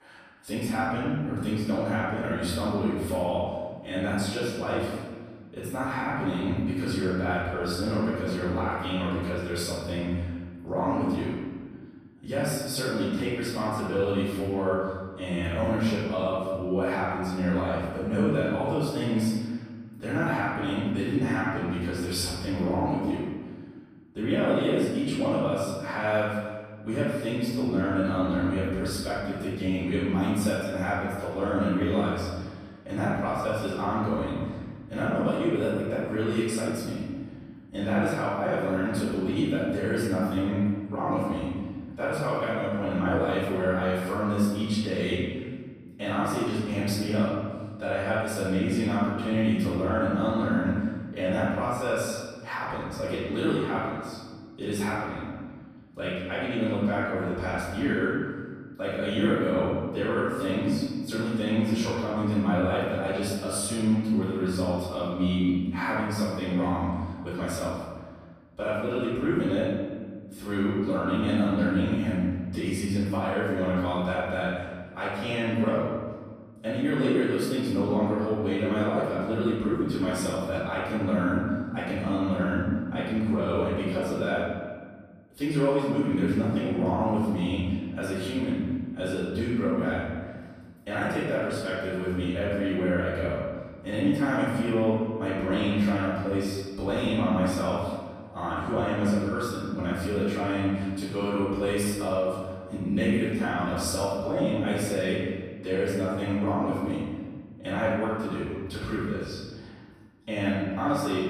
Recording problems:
room echo; strong; dies away in 1.6 s
off-mic speech; far

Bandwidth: 15 kHz